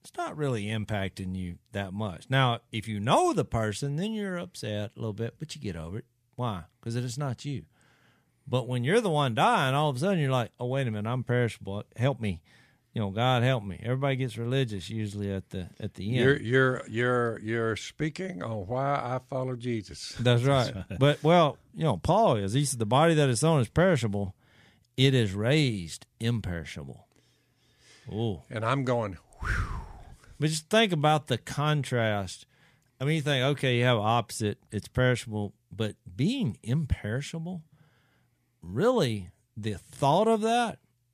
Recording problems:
none

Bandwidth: 14.5 kHz